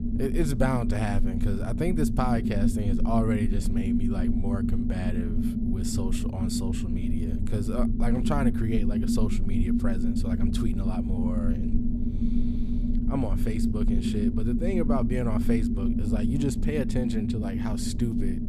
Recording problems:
low rumble; loud; throughout; as loud as the speech

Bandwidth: 14.5 kHz